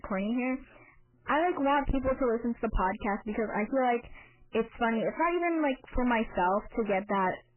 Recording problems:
distortion; heavy; 7 dB below the speech
garbled, watery; badly; nothing above 3 kHz

